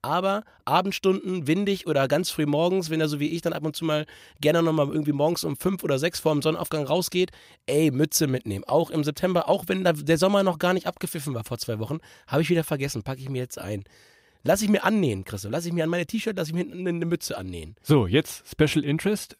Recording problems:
none

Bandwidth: 15.5 kHz